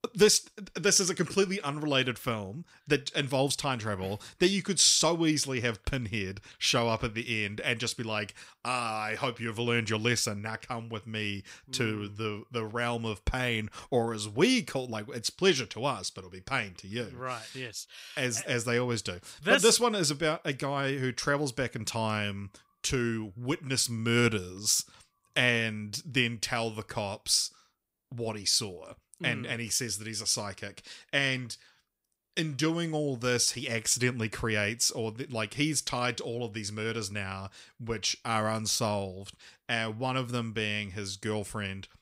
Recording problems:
none

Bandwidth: 15.5 kHz